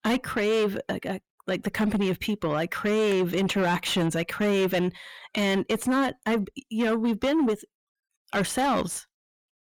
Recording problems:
distortion; heavy; 7 dB below the speech

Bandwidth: 18.5 kHz